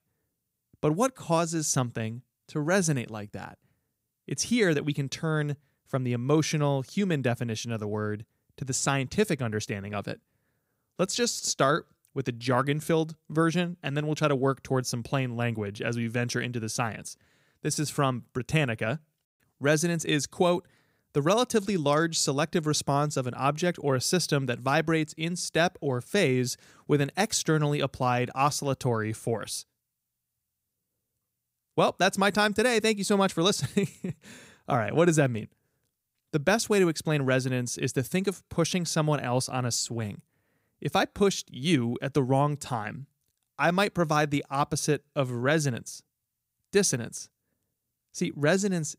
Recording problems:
none

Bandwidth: 15.5 kHz